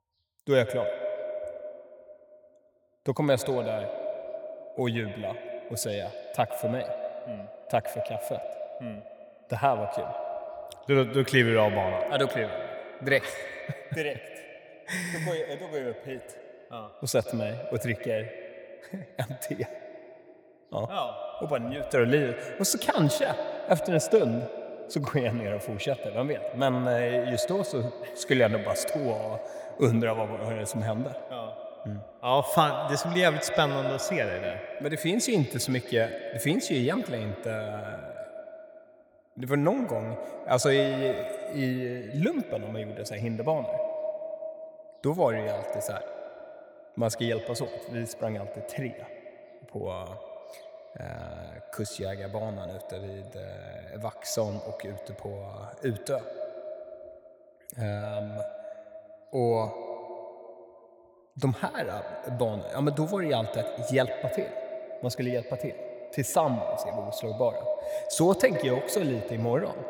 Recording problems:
echo of what is said; strong; throughout; 110 ms later, 8 dB below the speech

